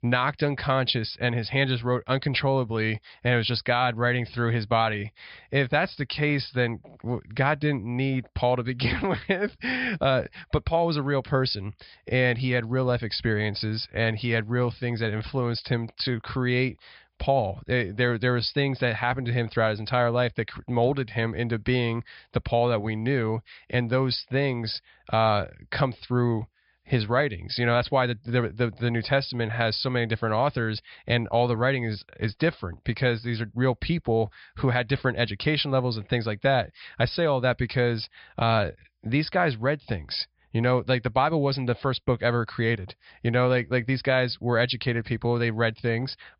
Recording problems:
high frequencies cut off; noticeable; nothing above 5.5 kHz

